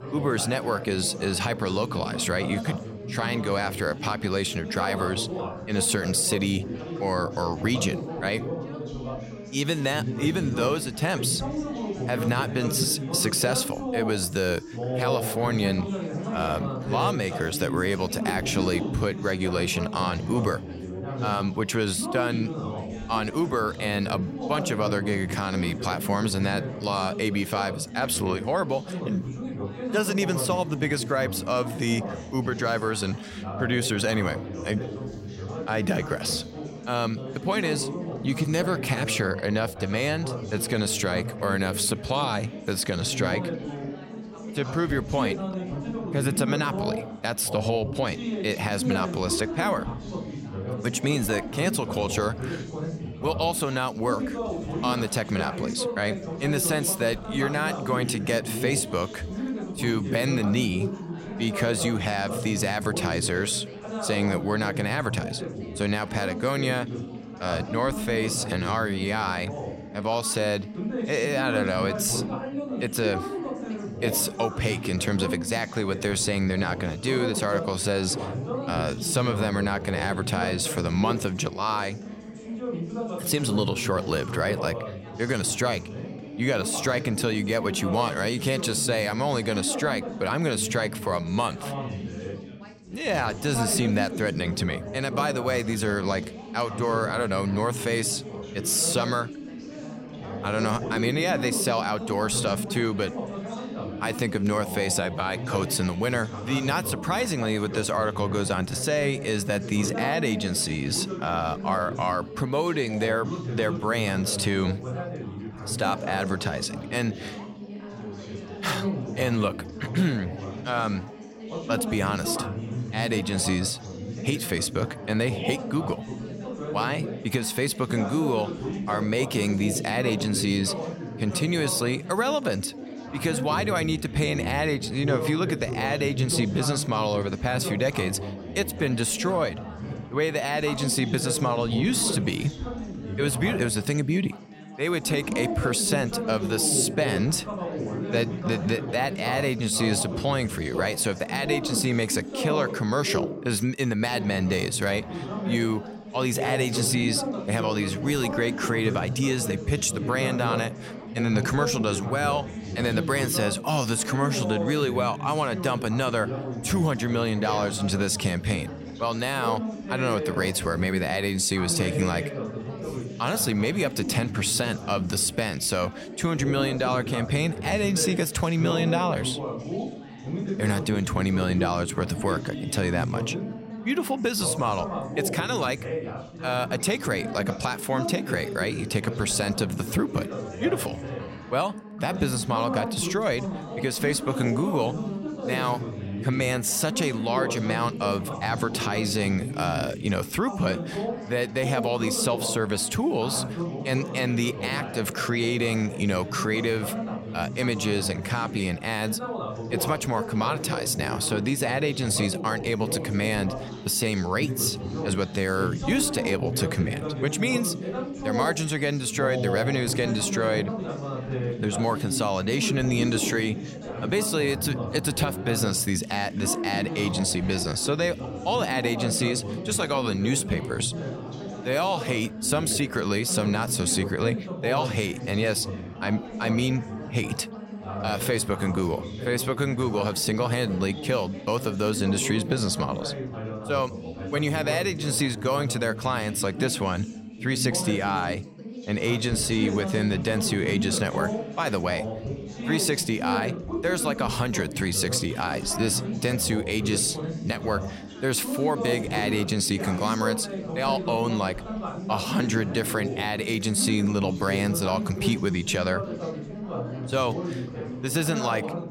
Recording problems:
background chatter; loud; throughout; 4 voices, 7 dB below the speech

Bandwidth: 16 kHz